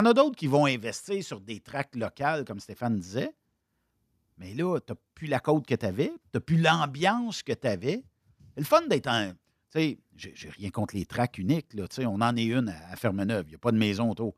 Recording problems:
abrupt cut into speech; at the start

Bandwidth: 14.5 kHz